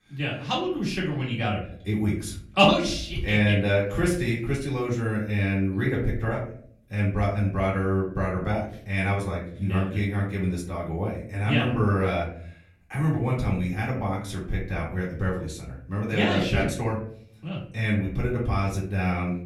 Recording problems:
off-mic speech; far
room echo; slight; dies away in 0.6 s

